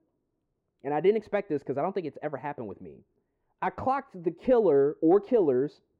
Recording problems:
muffled; very; fading above 3 kHz

